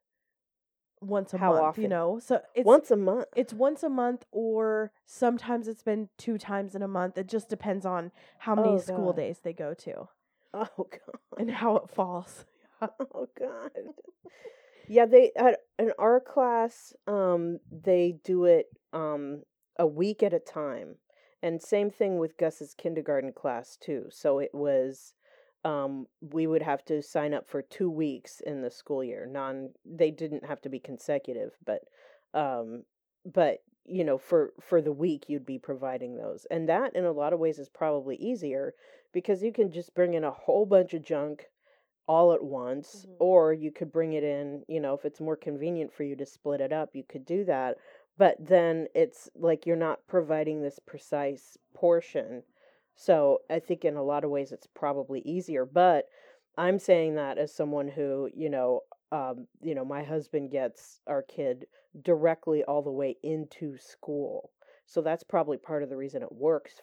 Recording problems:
muffled; slightly; fading above 2 kHz

